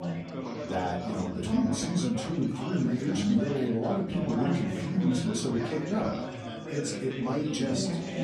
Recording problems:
off-mic speech; far
room echo; slight; dies away in 0.5 s
chatter from many people; loud; throughout; 3 dB below the speech
background music; faint; throughout; 25 dB below the speech

